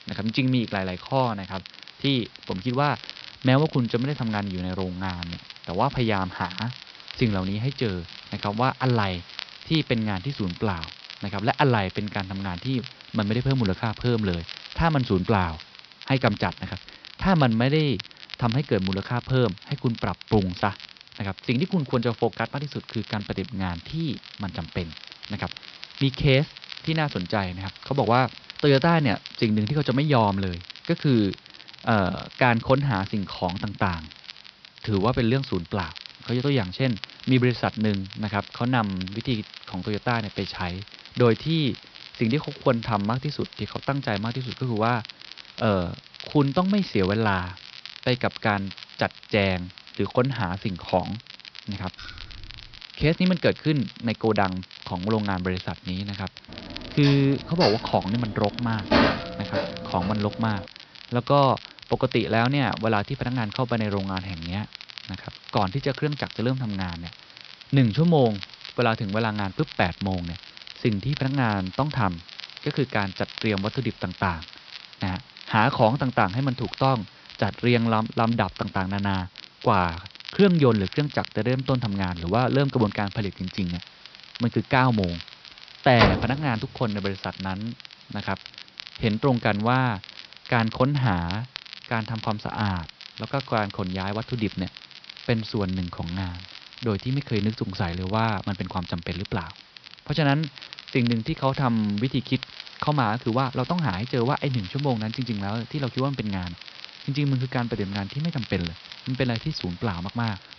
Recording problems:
high frequencies cut off; noticeable; nothing above 5.5 kHz
crackle, like an old record; noticeable; 15 dB below the speech
hiss; faint; throughout; 25 dB below the speech
jangling keys; faint; at 52 s; peak 15 dB below the speech
clattering dishes; loud; from 57 s to 1:00; peak 5 dB above the speech
door banging; loud; at 1:26; peak 3 dB above the speech

